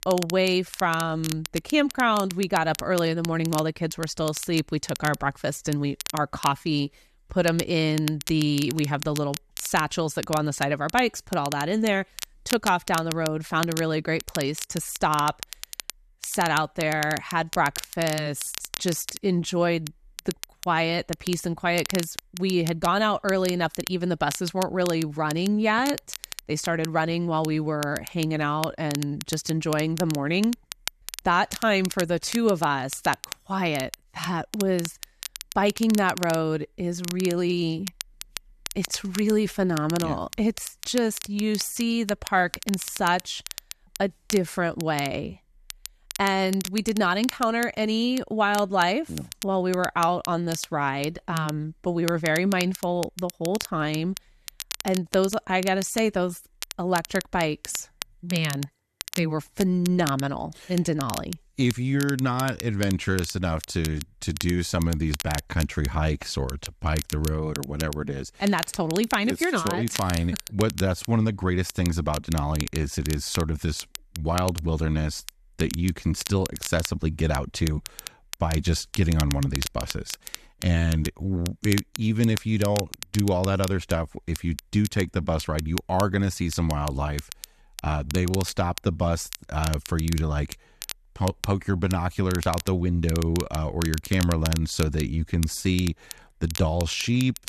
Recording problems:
crackle, like an old record; noticeable; 10 dB below the speech

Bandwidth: 13.5 kHz